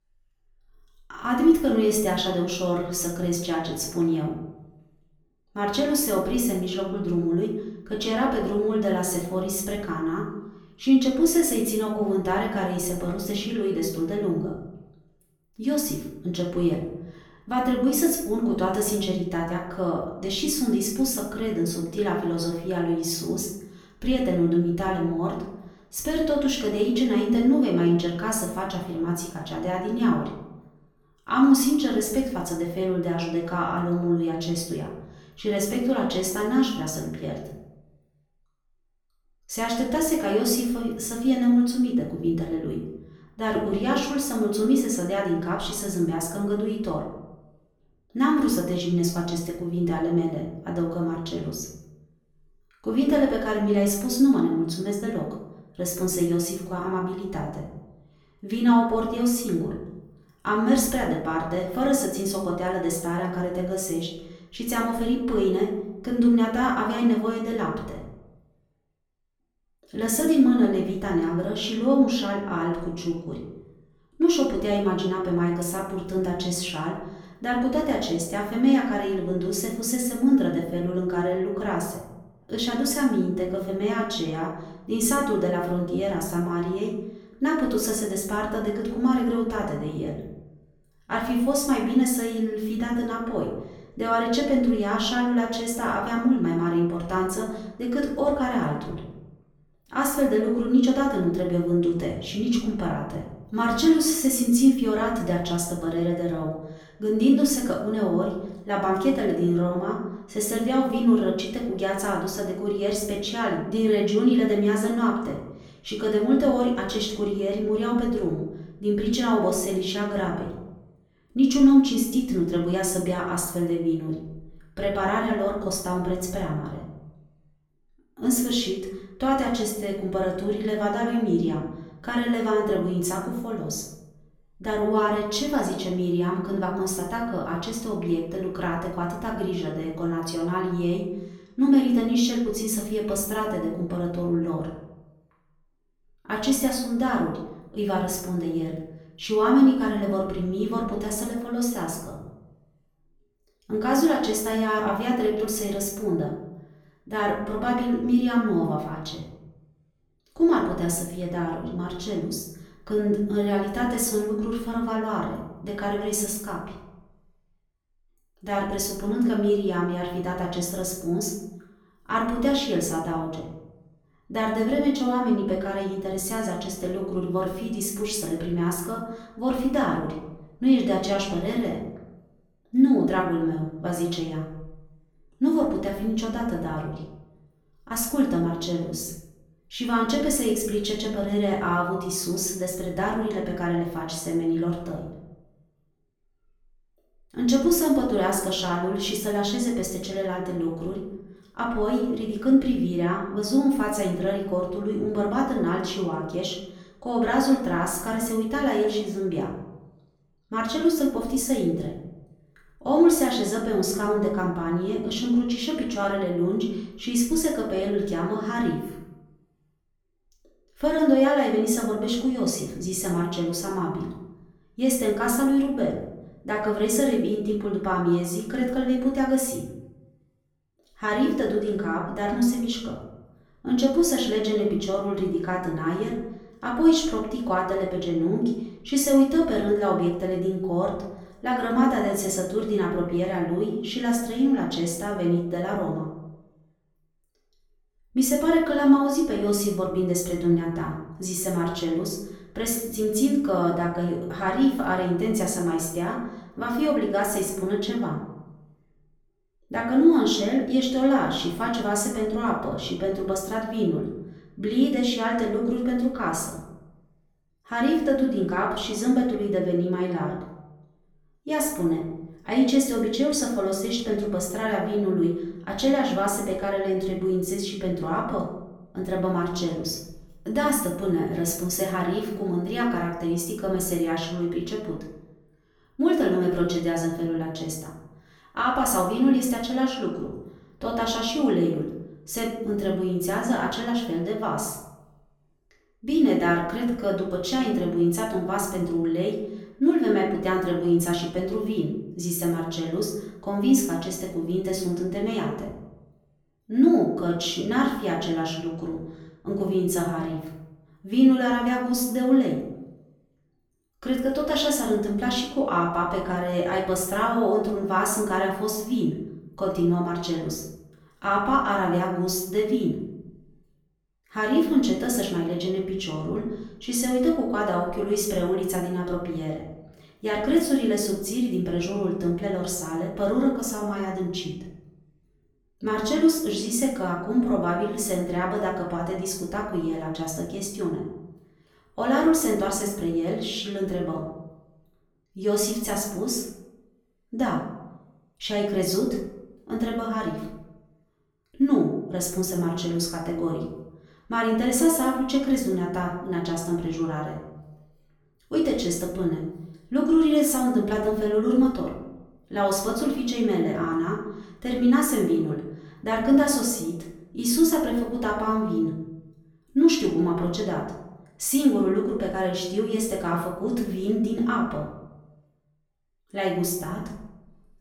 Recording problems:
off-mic speech; far
room echo; noticeable; dies away in 0.7 s

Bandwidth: 18 kHz